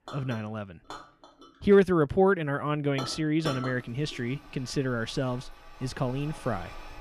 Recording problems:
household noises; noticeable; throughout; 15 dB below the speech

